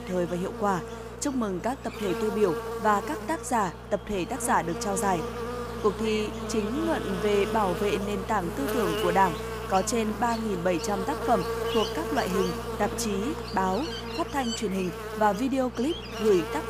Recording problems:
electrical hum; loud; throughout; 60 Hz, 6 dB below the speech

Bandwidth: 15 kHz